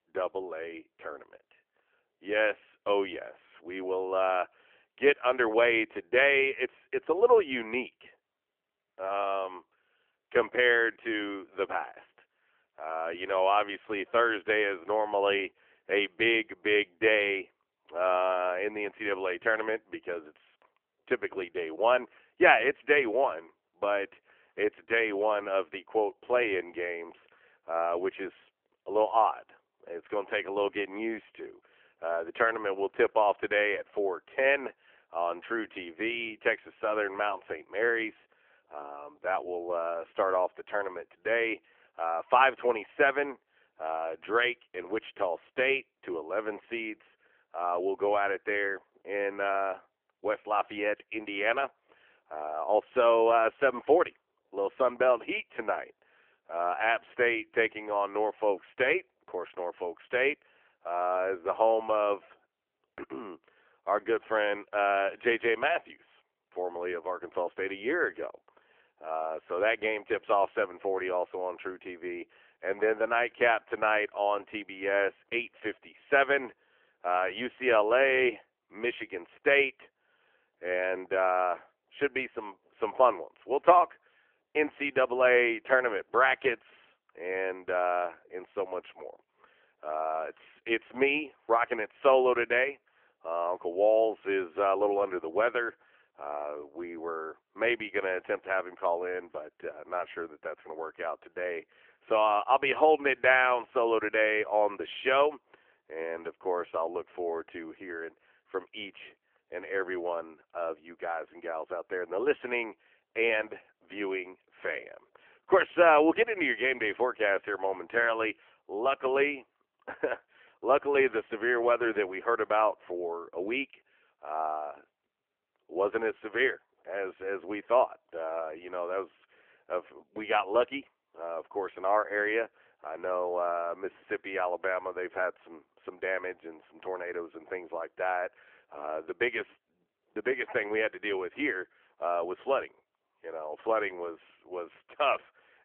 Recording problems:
phone-call audio; nothing above 3 kHz

